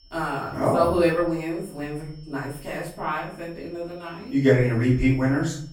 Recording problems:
off-mic speech; far
room echo; noticeable; dies away in 0.5 s
high-pitched whine; faint; throughout; 5.5 kHz, 30 dB below the speech

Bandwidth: 17 kHz